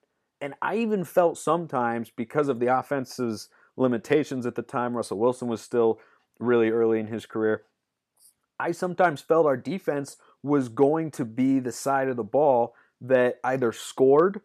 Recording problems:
none

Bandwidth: 14.5 kHz